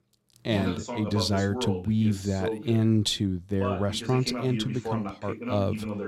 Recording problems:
voice in the background; loud; throughout; 7 dB below the speech

